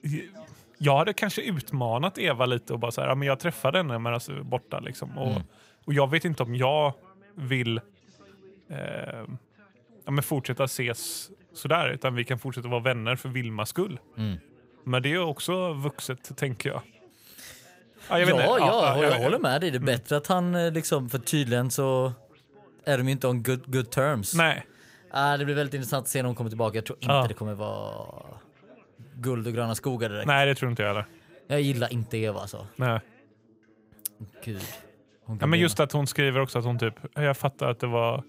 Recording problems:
background chatter; faint; throughout; 3 voices, 30 dB below the speech

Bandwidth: 15.5 kHz